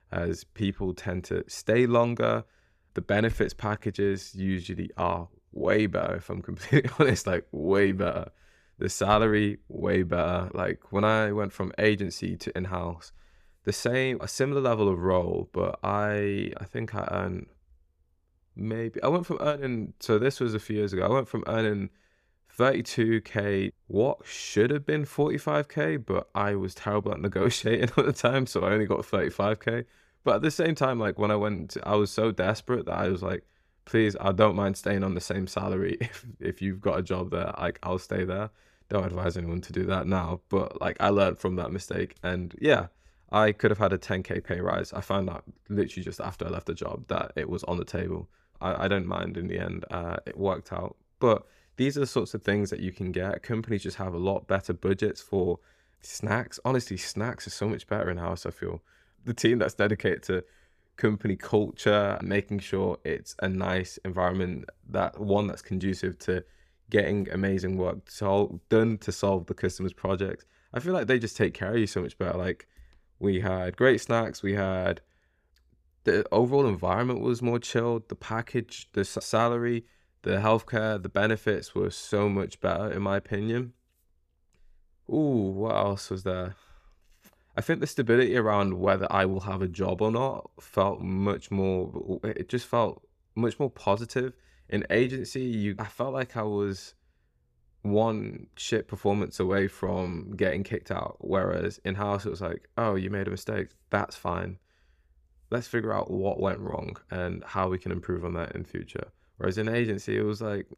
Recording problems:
none

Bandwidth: 14.5 kHz